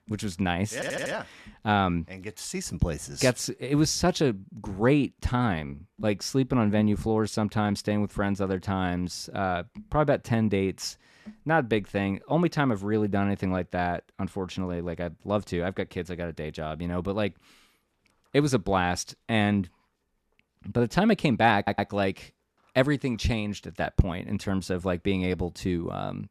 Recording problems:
audio stuttering; at 0.5 s and at 22 s

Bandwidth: 13.5 kHz